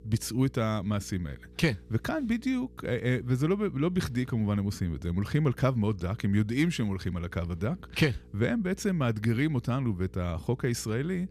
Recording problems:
electrical hum; faint; throughout; 60 Hz, 25 dB below the speech

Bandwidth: 14.5 kHz